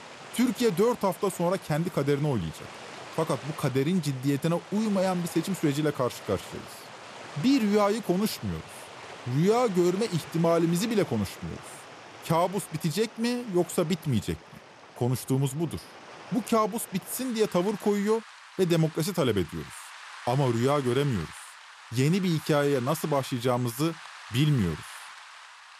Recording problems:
rain or running water; noticeable; throughout; 15 dB below the speech

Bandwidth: 14.5 kHz